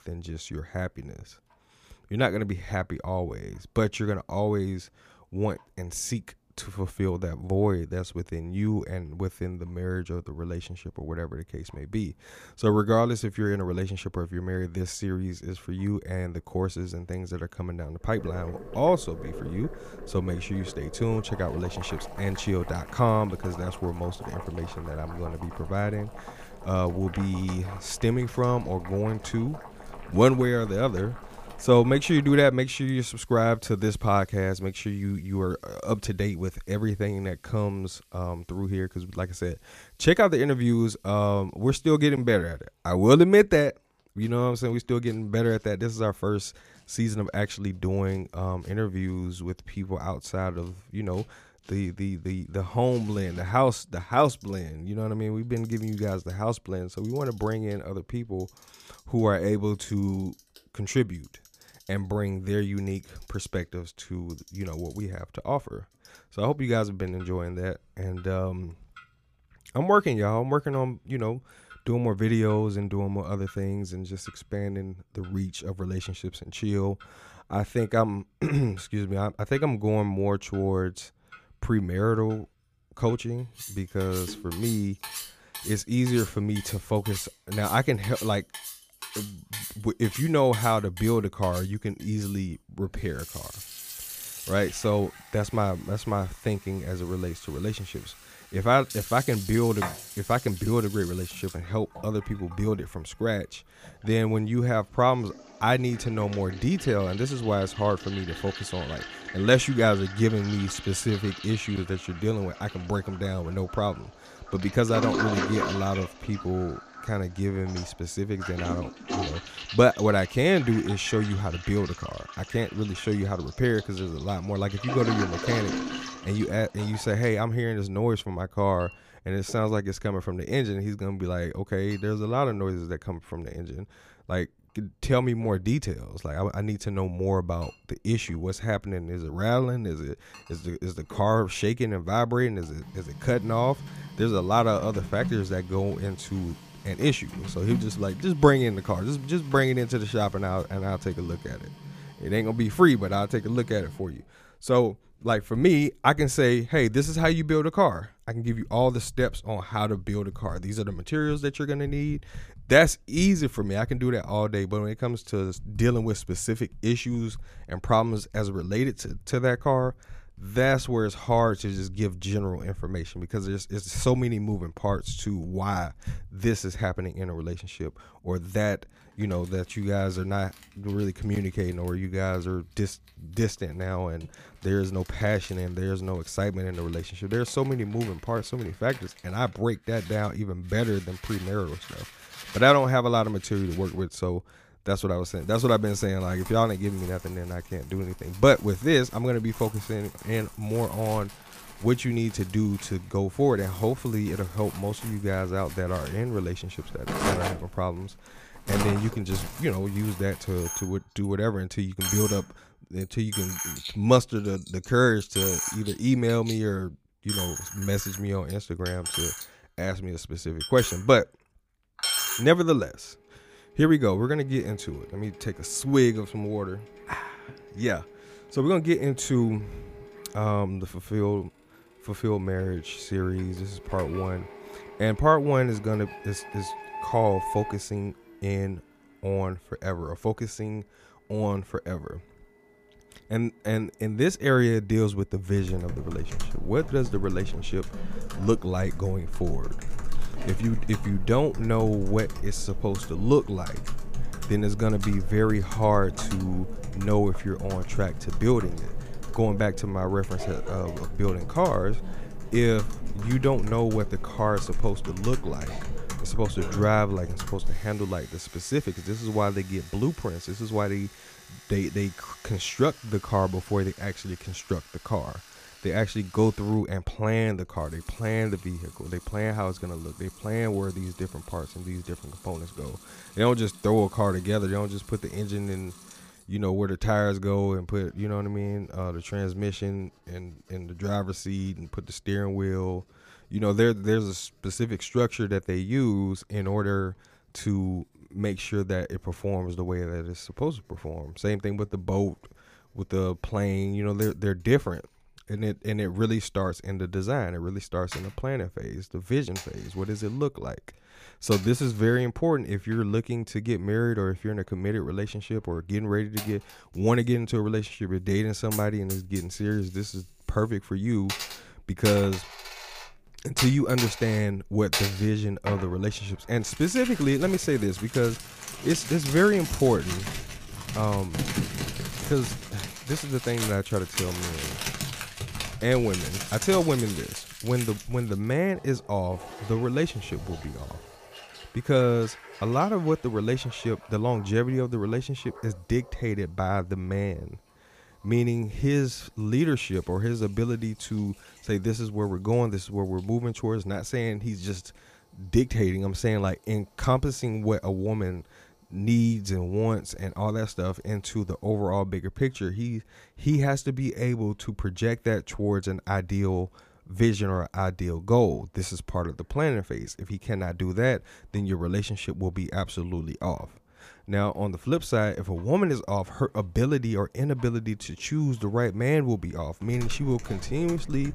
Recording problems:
household noises; noticeable; throughout; 10 dB below the speech

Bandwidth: 15 kHz